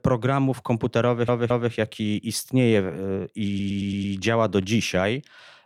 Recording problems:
audio stuttering; at 1 s and at 3.5 s

